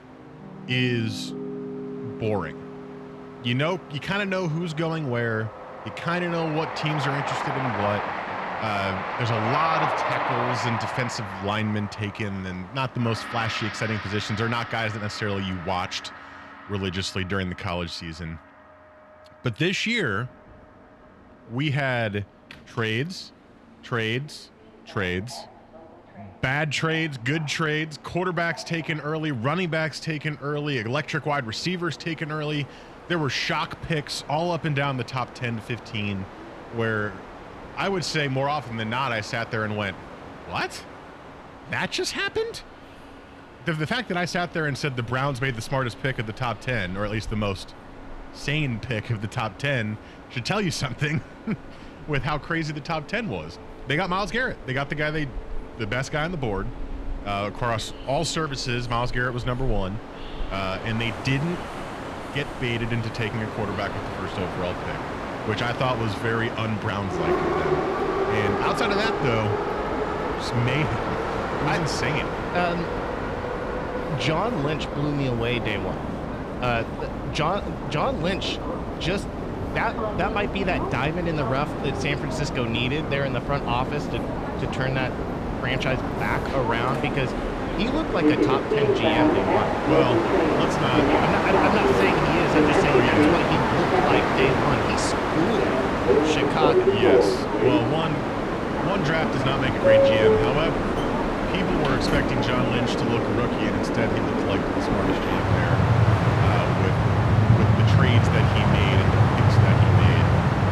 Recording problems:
train or aircraft noise; very loud; throughout; 3 dB above the speech
background music; noticeable; throughout; 15 dB below the speech

